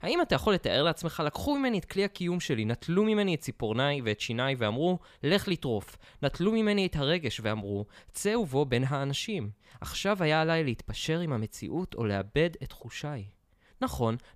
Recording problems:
none

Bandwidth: 15 kHz